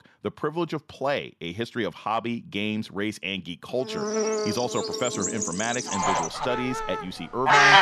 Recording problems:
animal sounds; very loud; from 4 s on; 5 dB above the speech

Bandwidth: 13.5 kHz